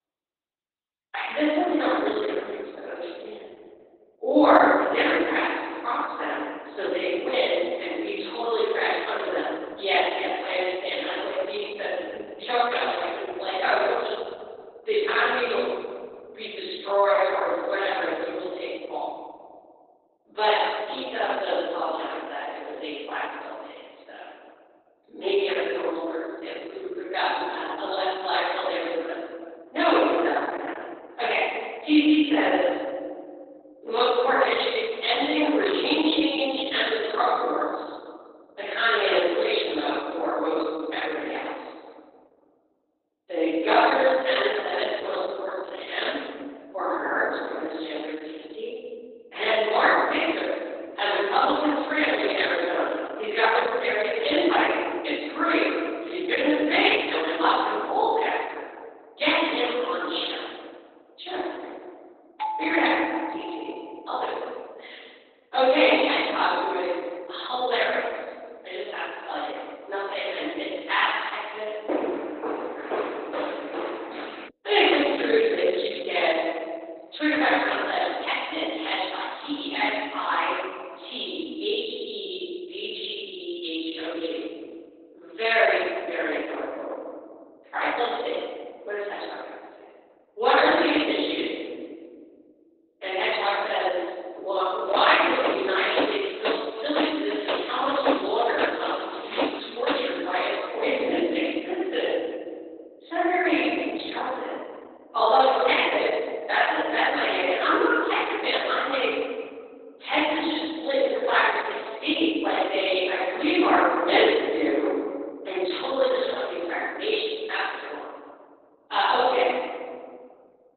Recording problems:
room echo; strong; dies away in 1.7 s
off-mic speech; far
garbled, watery; badly; nothing above 4 kHz
thin; very slightly; fading below 300 Hz
doorbell; noticeable; from 1:02 to 1:04; peak 5 dB below the speech
footsteps; noticeable; from 1:12 to 1:14 and from 1:35 to 1:40; peak 2 dB below the speech

